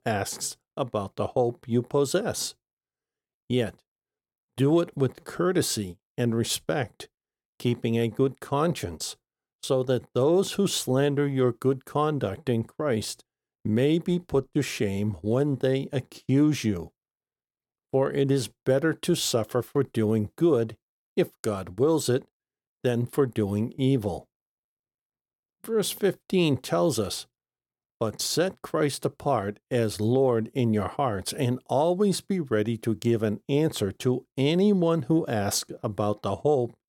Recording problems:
none

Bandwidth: 17.5 kHz